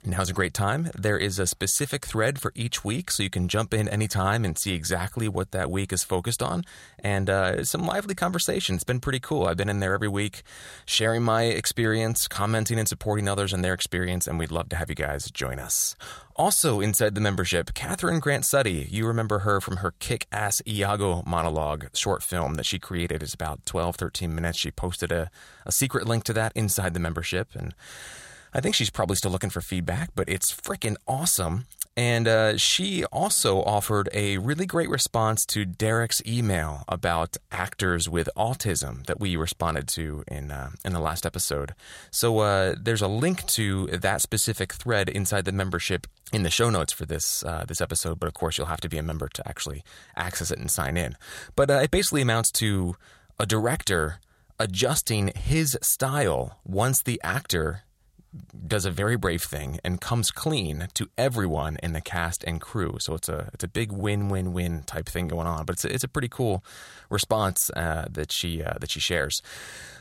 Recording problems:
none

